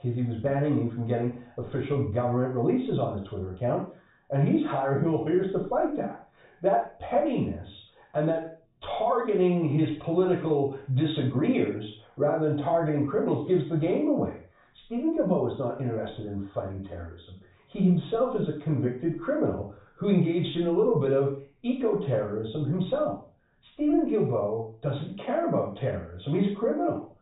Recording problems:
off-mic speech; far
high frequencies cut off; severe; nothing above 4 kHz
room echo; noticeable; dies away in 0.4 s

